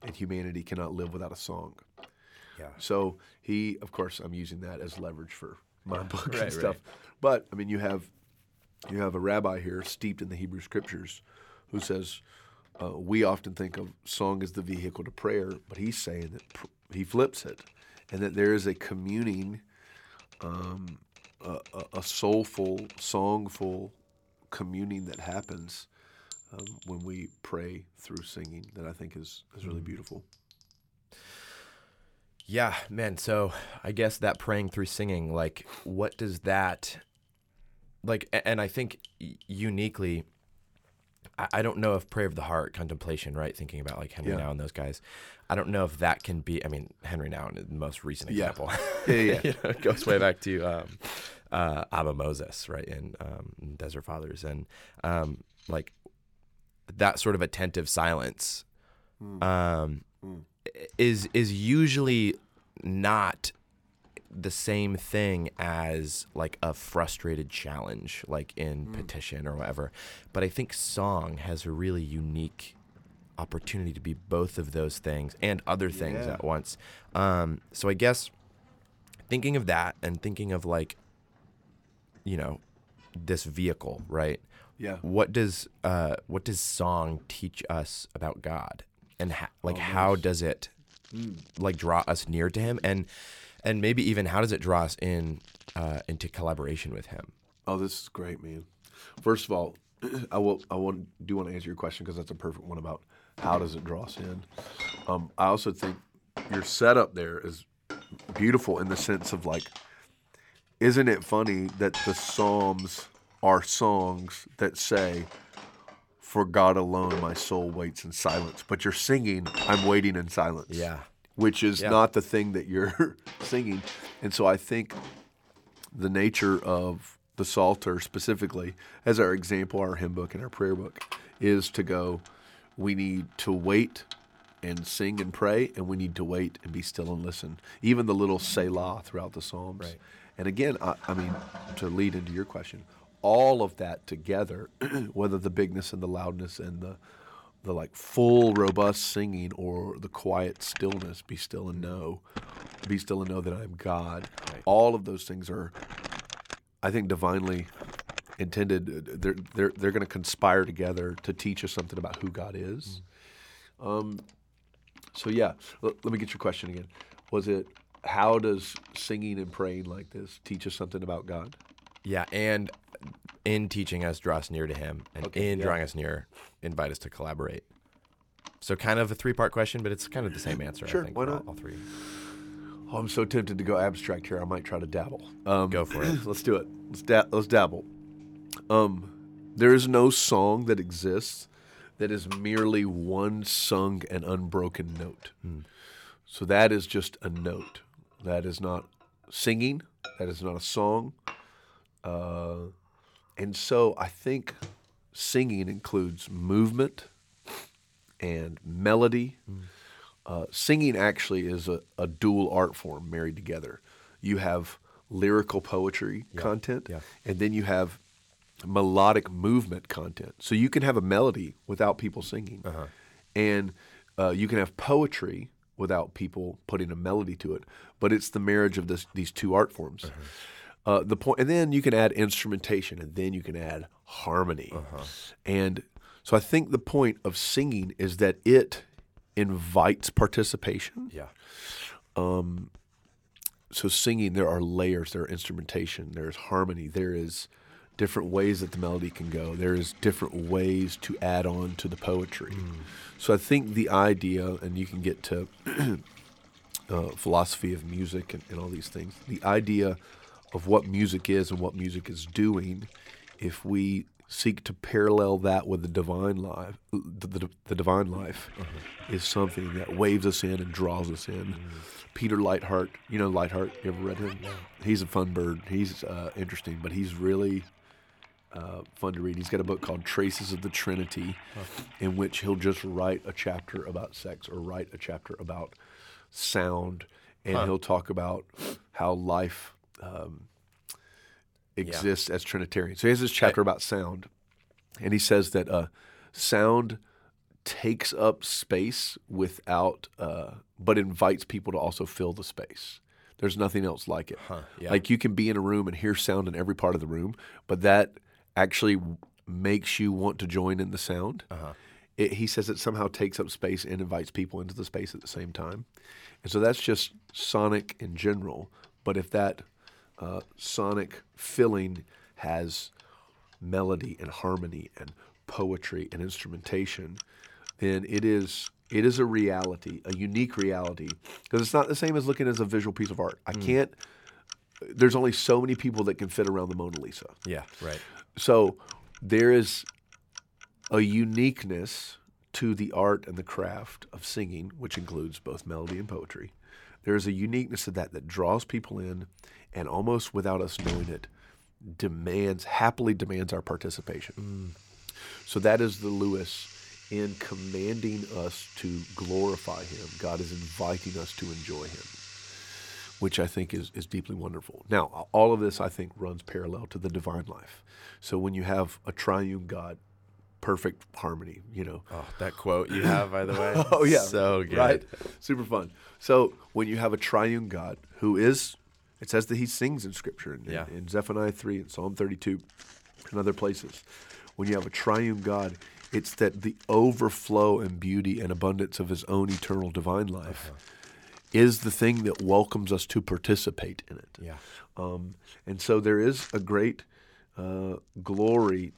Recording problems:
household noises; noticeable; throughout; 15 dB below the speech

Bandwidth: 18 kHz